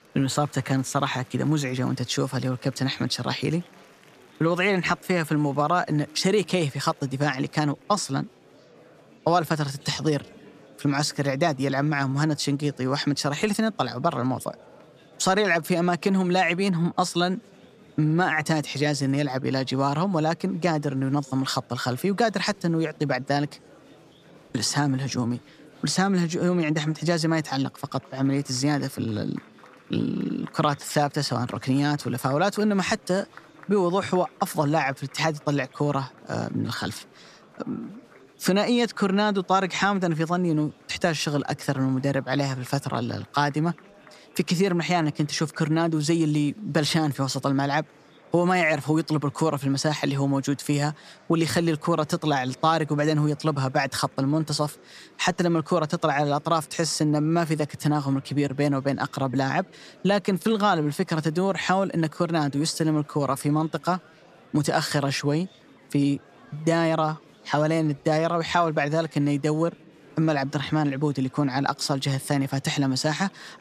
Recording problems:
murmuring crowd; faint; throughout; 25 dB below the speech

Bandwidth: 14.5 kHz